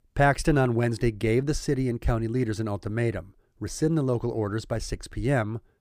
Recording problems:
none

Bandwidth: 15 kHz